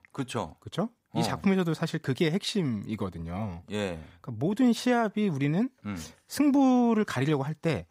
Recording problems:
none

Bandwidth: 15.5 kHz